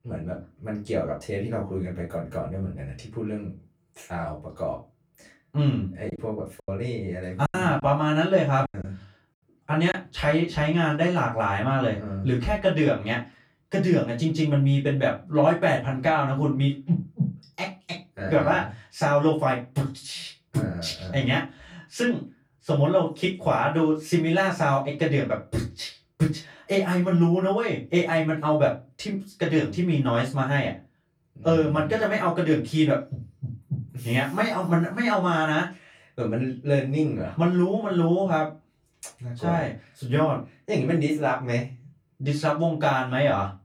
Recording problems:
off-mic speech; far
room echo; slight; dies away in 0.2 s
choppy; very; from 6 to 10 s; 9% of the speech affected

